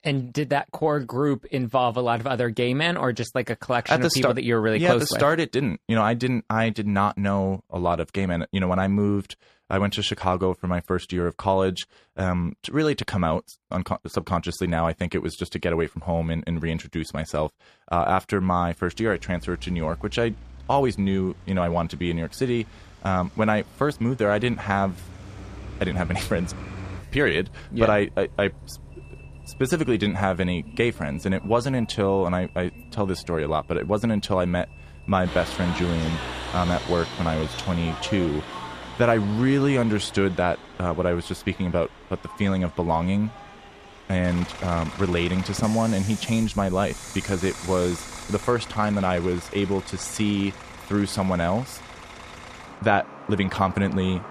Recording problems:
traffic noise; noticeable; from 19 s on; 15 dB below the speech

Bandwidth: 14.5 kHz